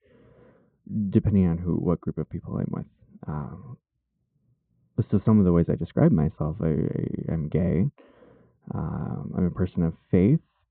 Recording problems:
muffled; very; fading above 1.5 kHz
high frequencies cut off; severe; nothing above 4 kHz

